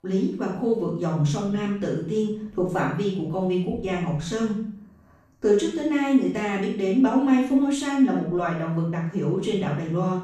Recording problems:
off-mic speech; far
room echo; noticeable; dies away in 0.6 s

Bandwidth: 14.5 kHz